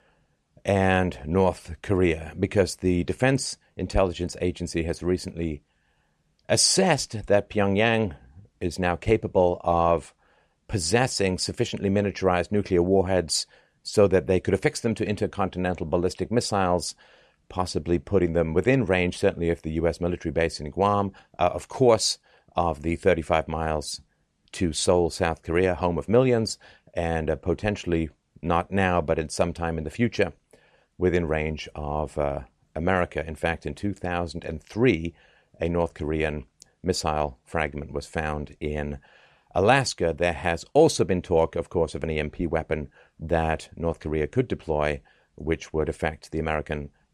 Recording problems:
none

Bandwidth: 14.5 kHz